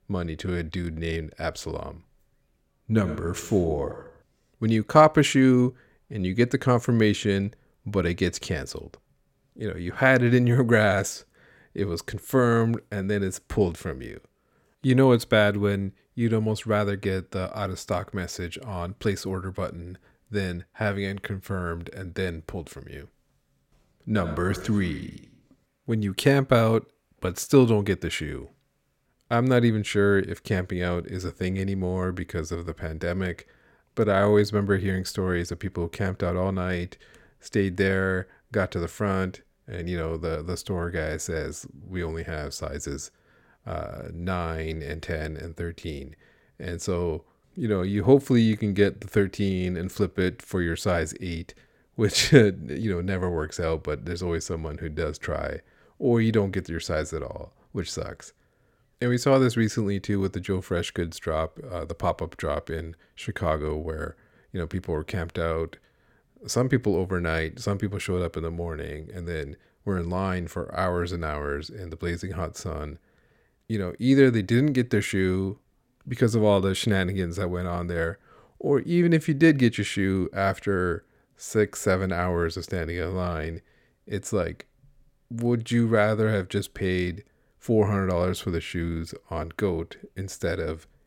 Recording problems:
none

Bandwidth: 16.5 kHz